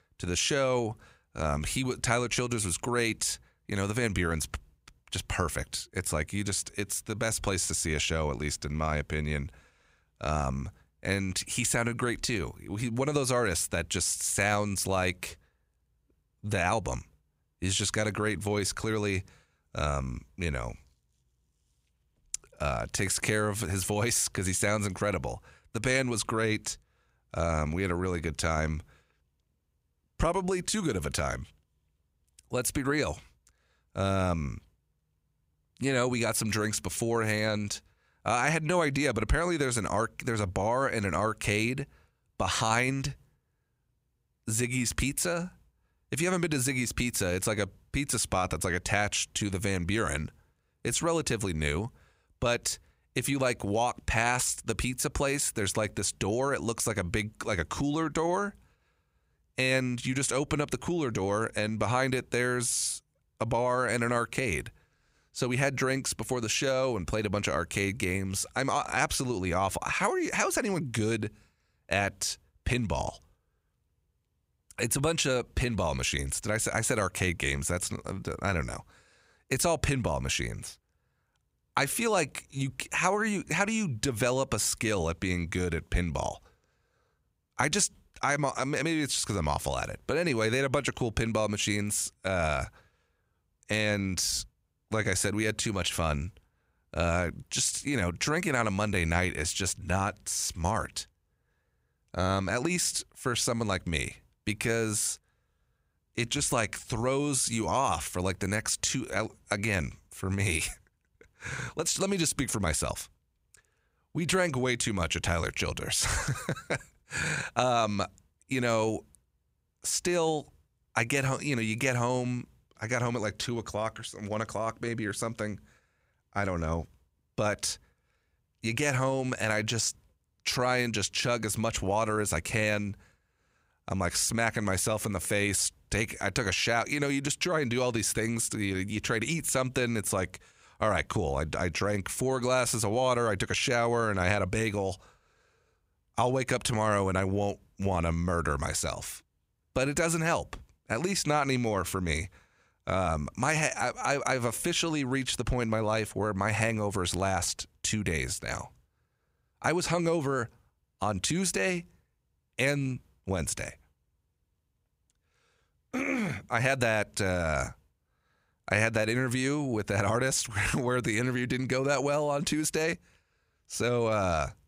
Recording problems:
none

